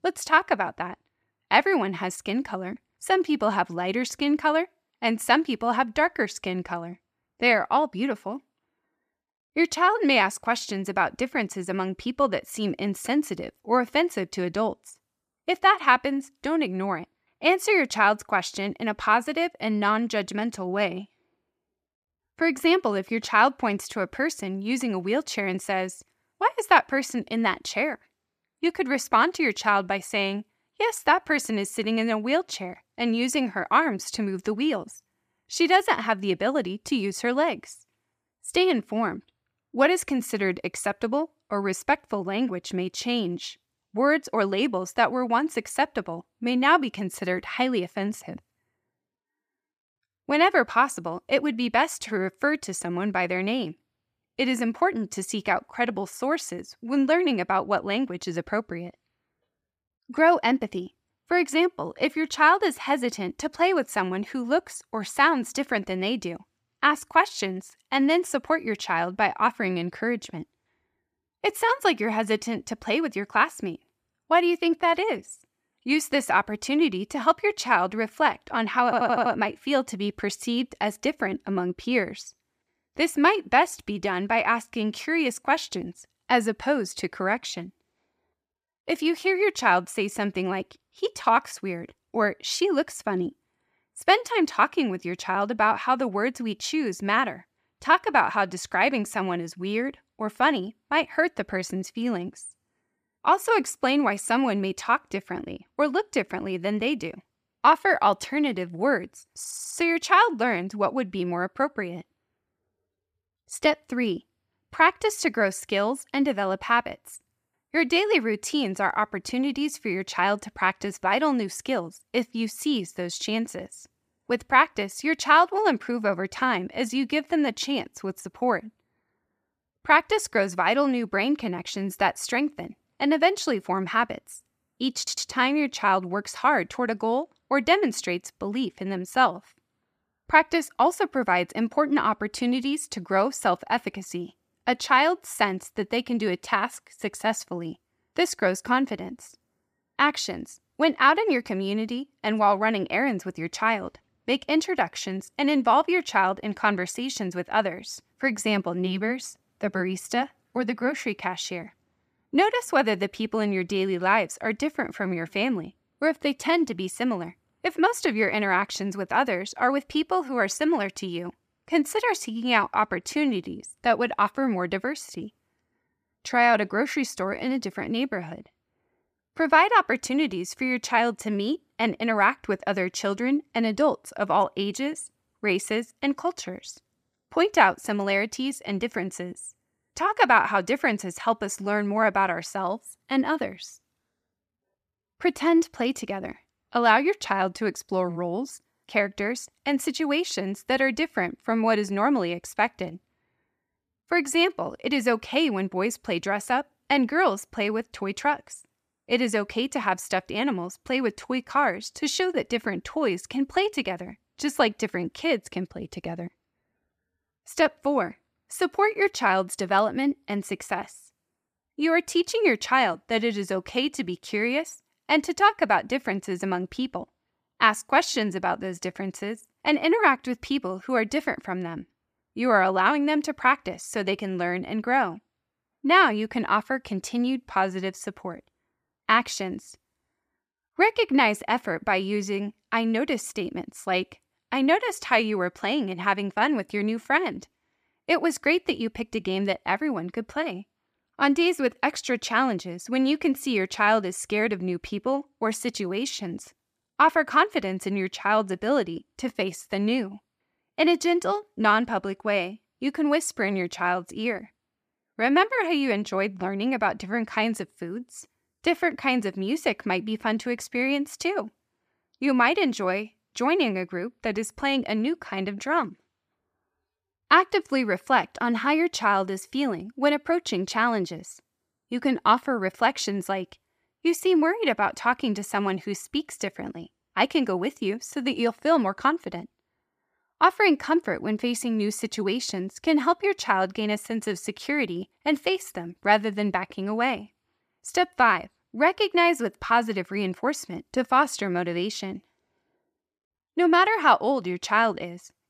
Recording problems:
audio stuttering; at 1:19, at 1:49 and at 2:15

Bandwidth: 15 kHz